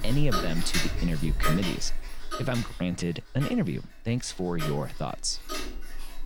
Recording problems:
household noises; loud; throughout; 3 dB below the speech

